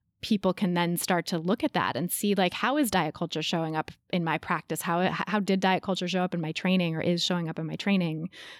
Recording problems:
none

